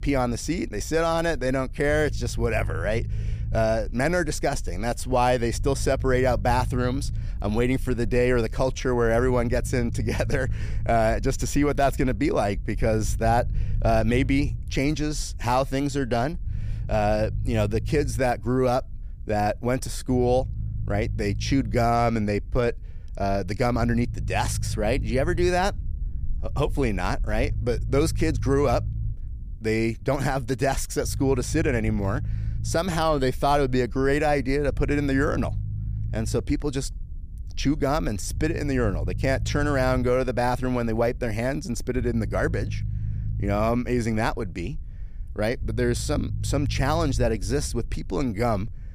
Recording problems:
low rumble; faint; throughout; 20 dB below the speech

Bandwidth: 14.5 kHz